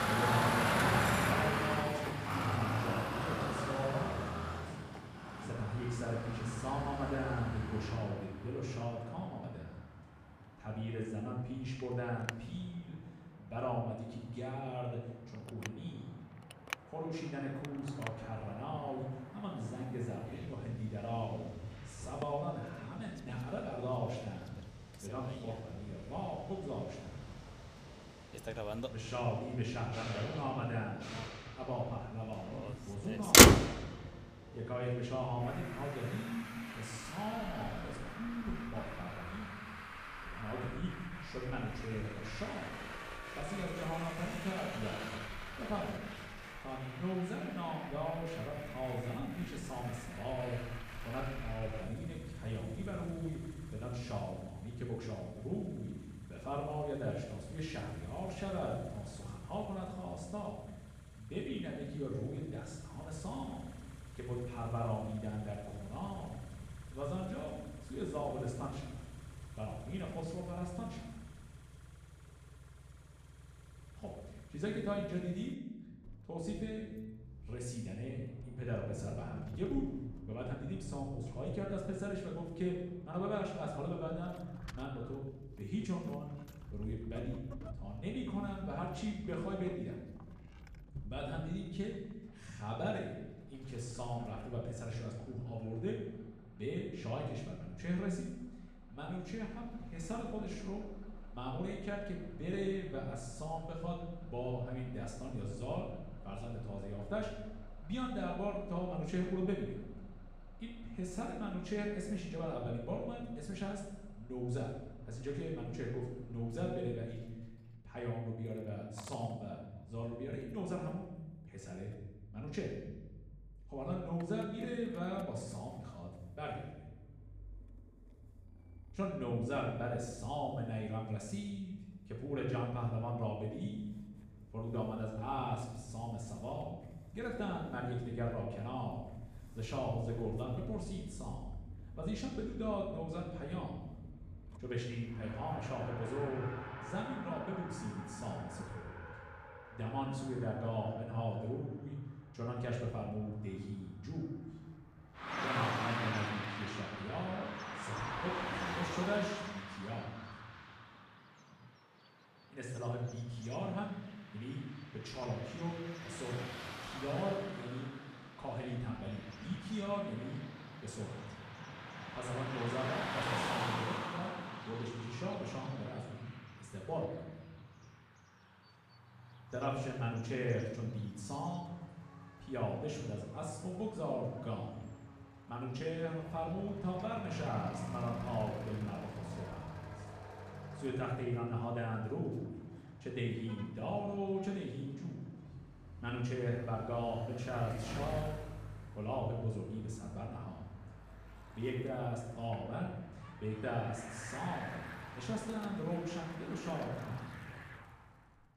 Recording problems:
off-mic speech; far
room echo; noticeable; dies away in 1 s
traffic noise; very loud; throughout; 2 dB above the speech

